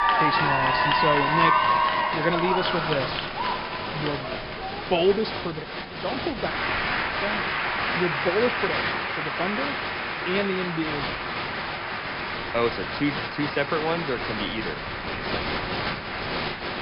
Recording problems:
high frequencies cut off; noticeable; nothing above 5.5 kHz
crowd noise; very loud; throughout; 3 dB above the speech
wind noise on the microphone; occasional gusts; 15 dB below the speech

